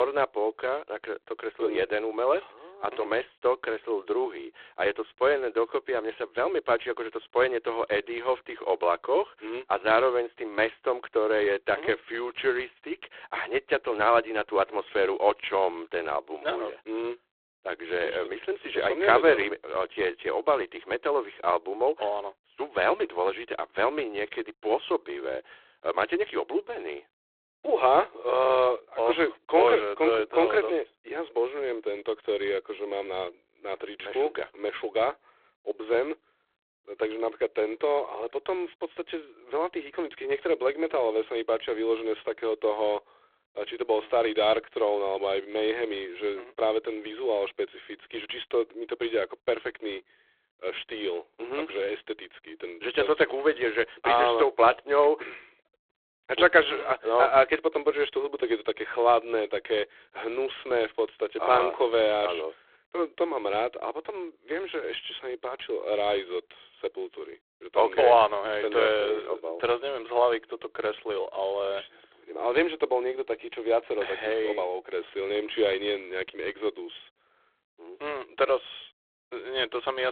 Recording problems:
phone-call audio; poor line
abrupt cut into speech; at the start and the end

